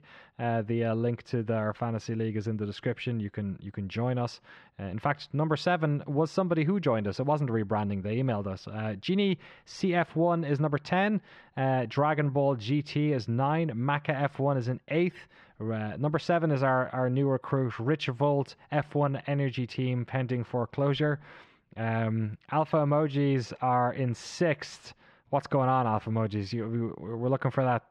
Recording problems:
muffled; slightly; fading above 2.5 kHz

